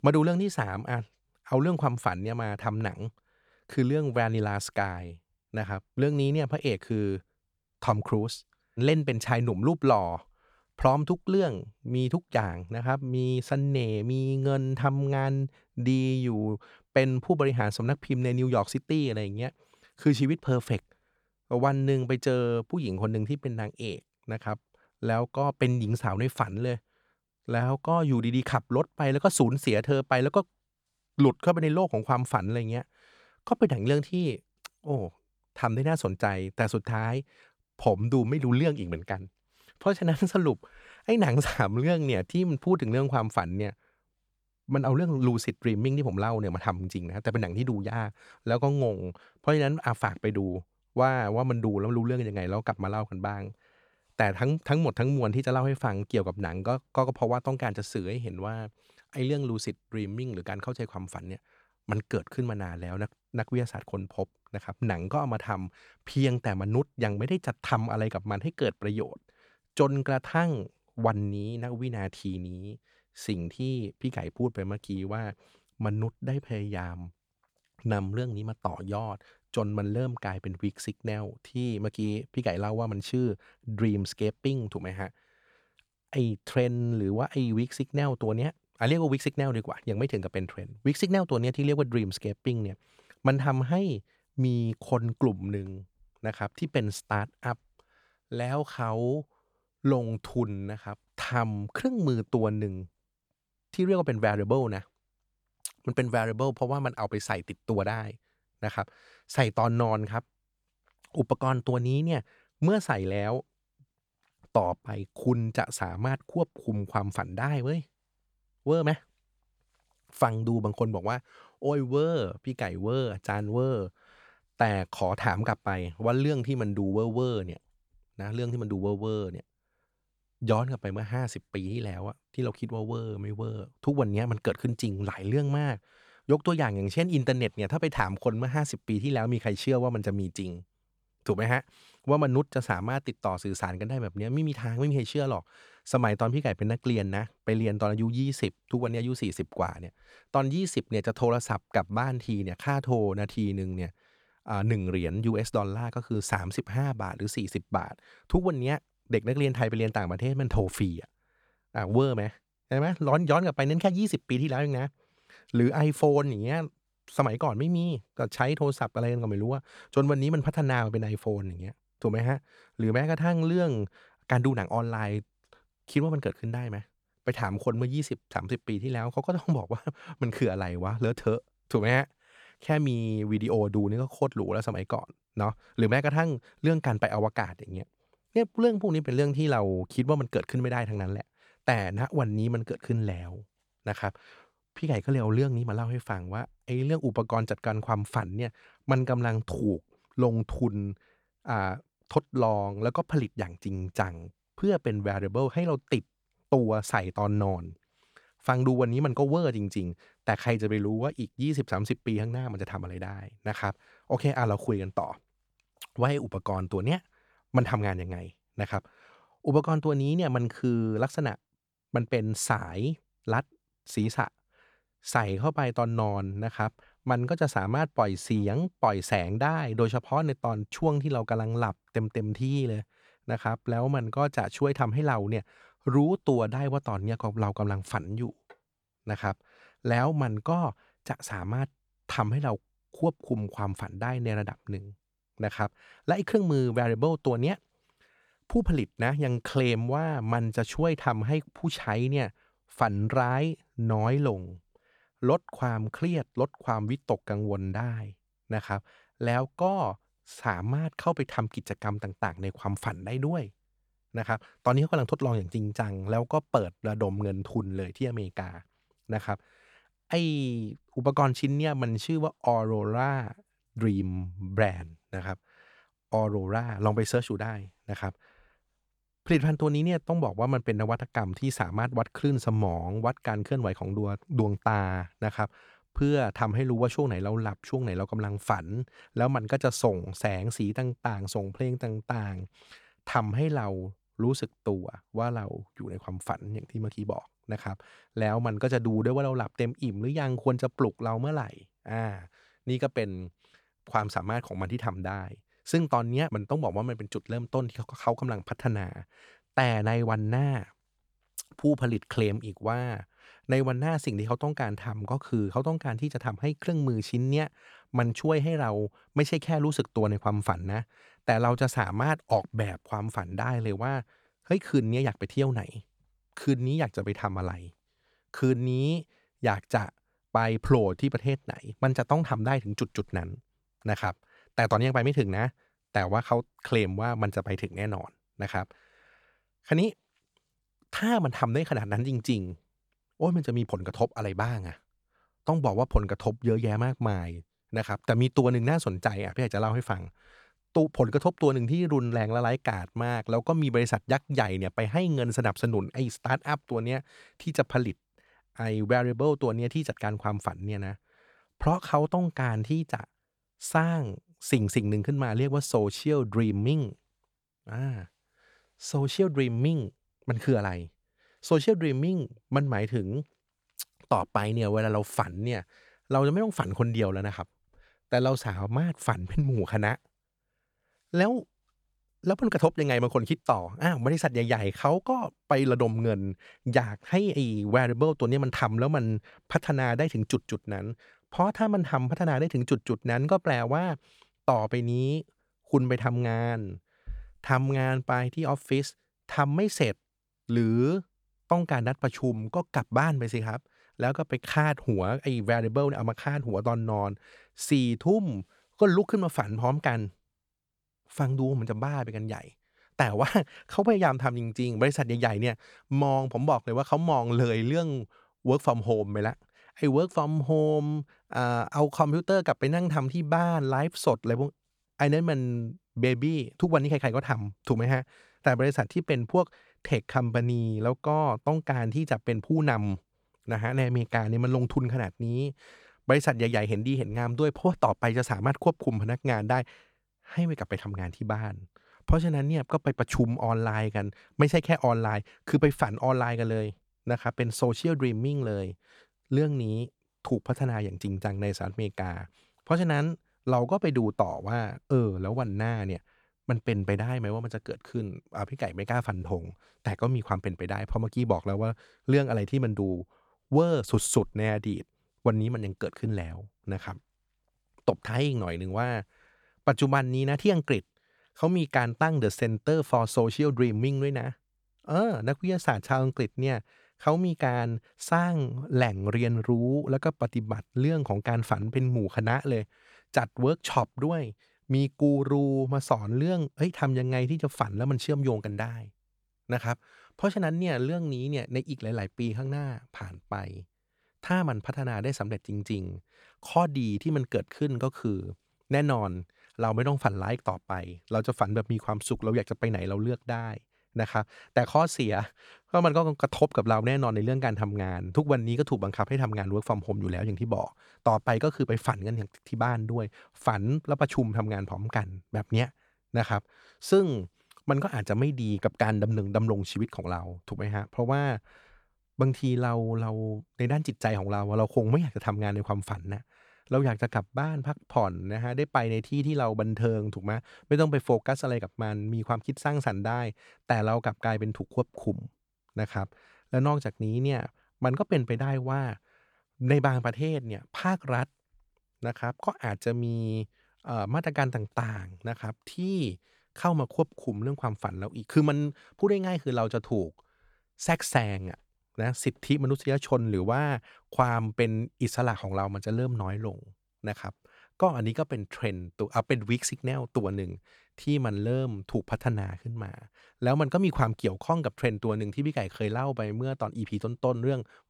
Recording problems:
none

